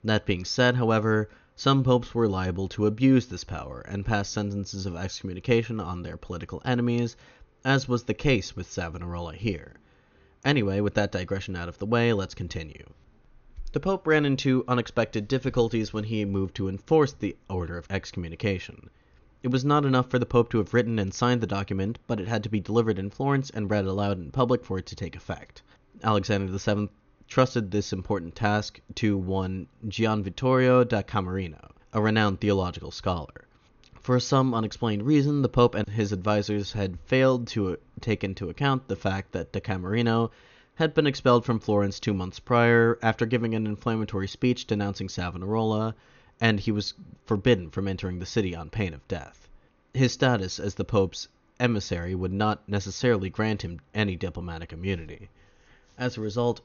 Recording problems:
high frequencies cut off; noticeable; nothing above 6.5 kHz

